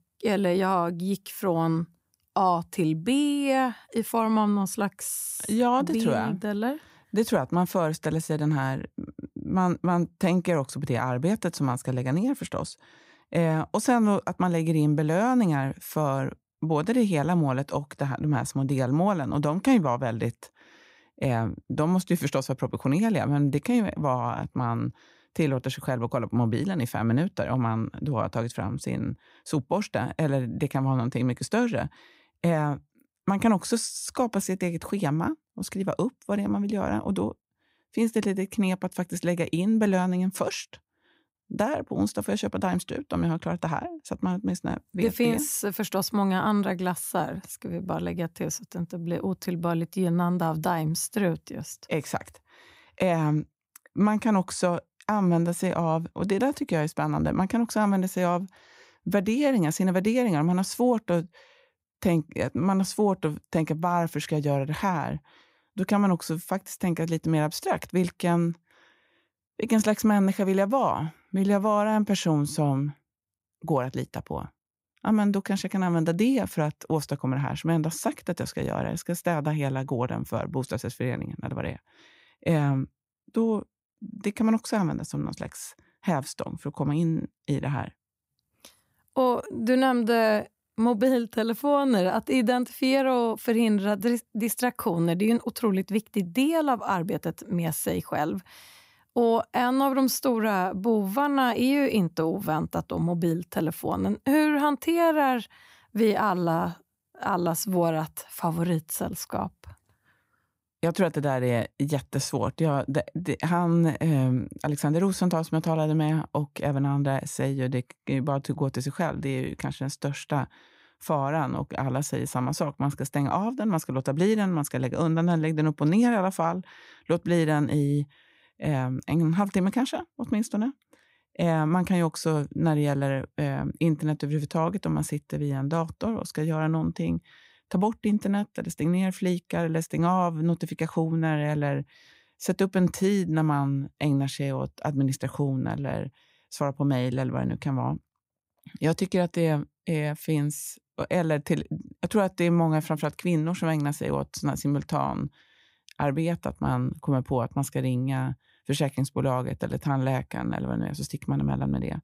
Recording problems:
none

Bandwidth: 15.5 kHz